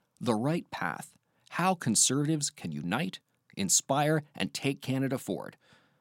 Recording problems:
none

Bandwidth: 16.5 kHz